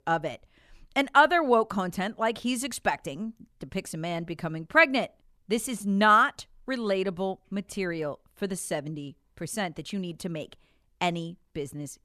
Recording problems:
none

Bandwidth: 14 kHz